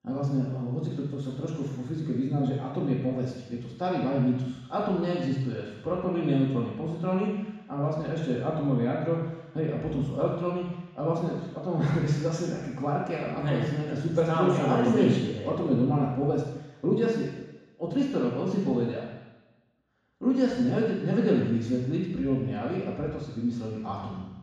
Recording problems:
room echo; strong; dies away in 1.1 s
off-mic speech; far

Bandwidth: 13.5 kHz